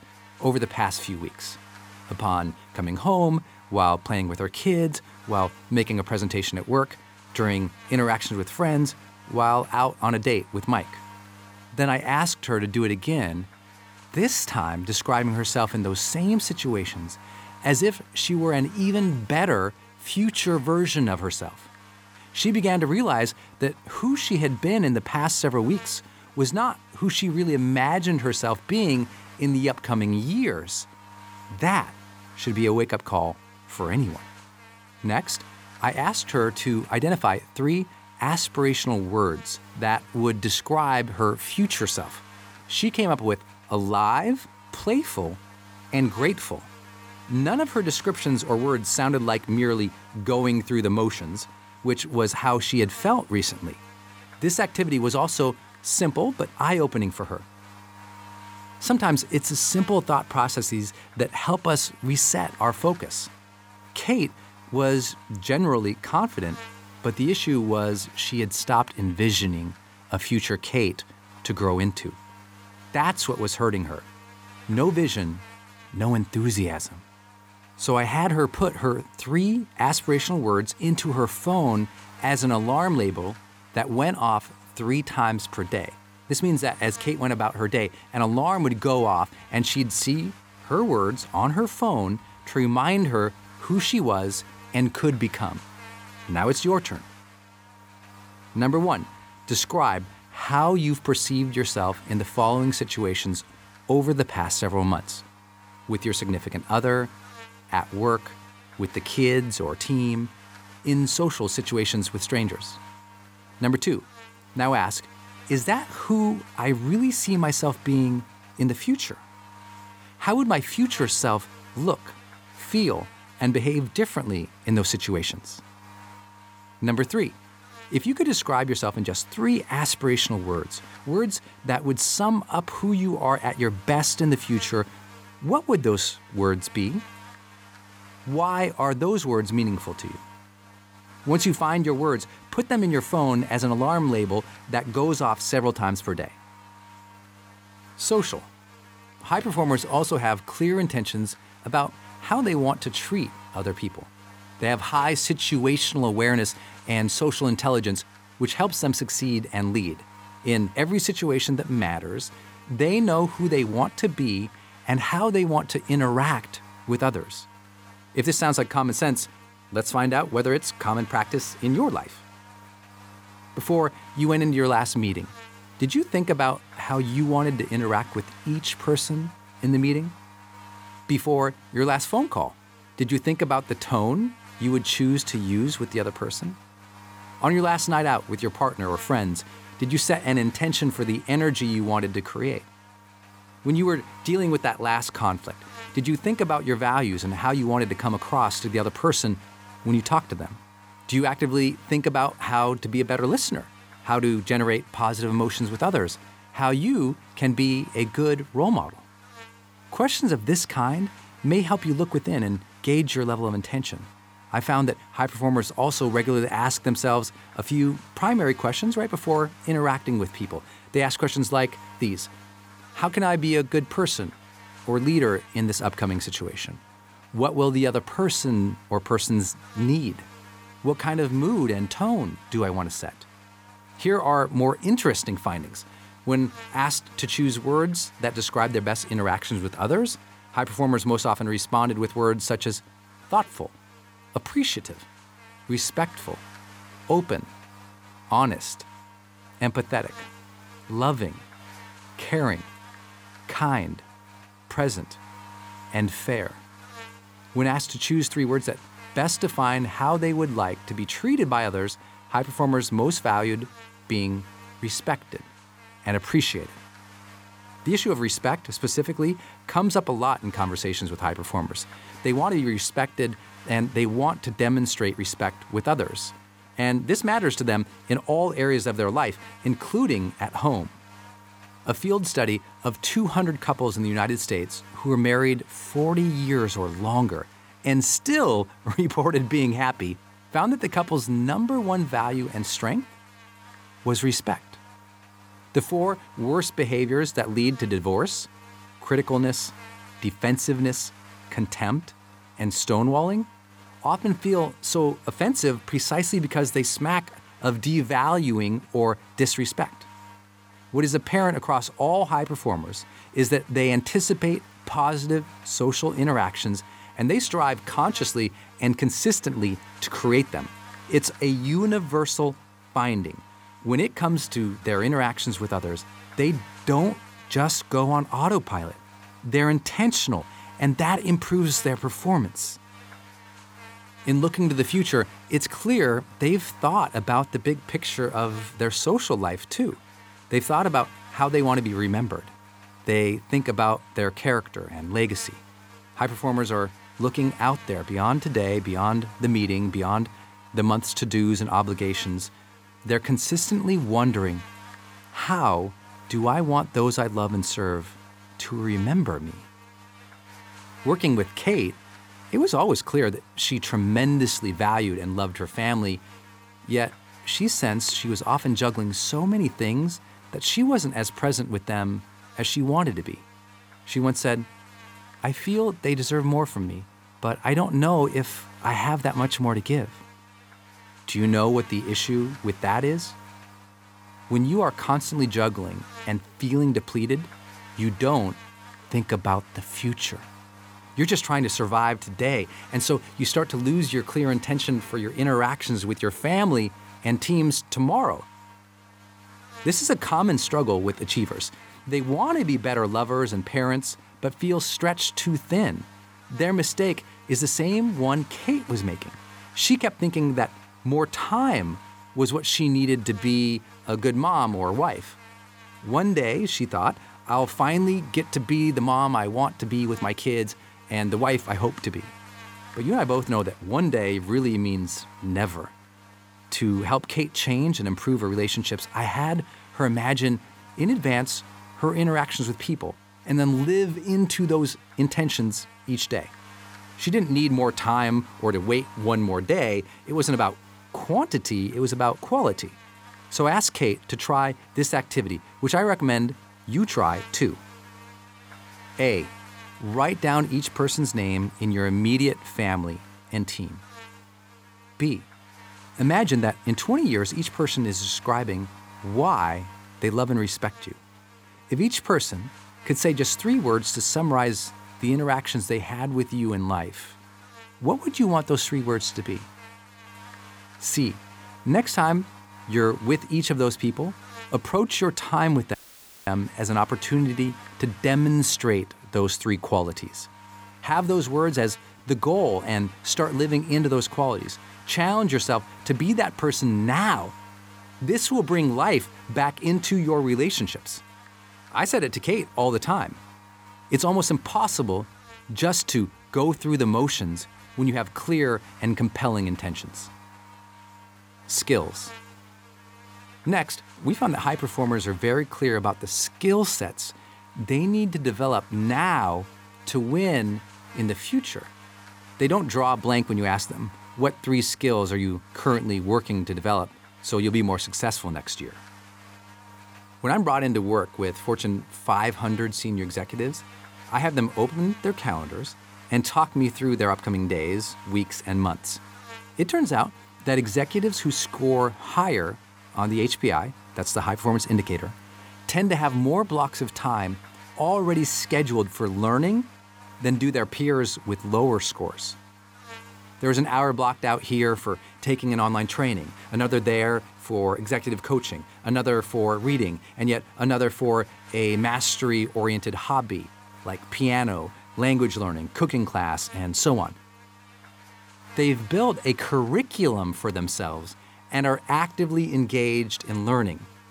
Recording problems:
electrical hum; faint; throughout; 50 Hz, 20 dB below the speech
audio cutting out; at 7:56 for 0.5 s

